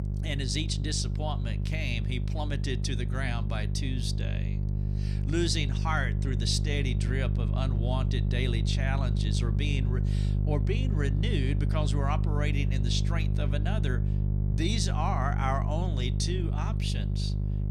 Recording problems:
electrical hum; loud; throughout; 50 Hz, 8 dB below the speech

